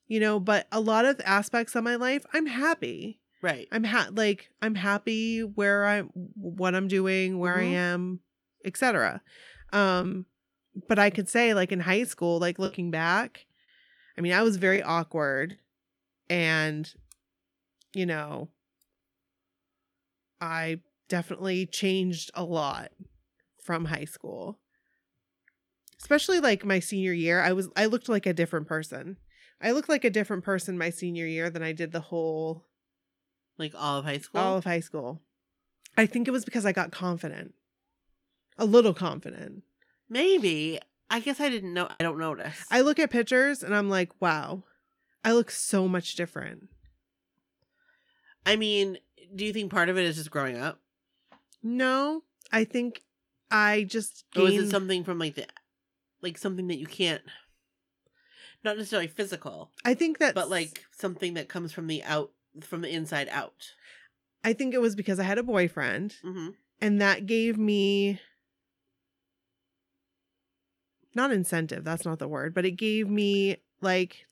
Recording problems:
choppy; occasionally; from 13 to 15 s and at 42 s; 5% of the speech affected

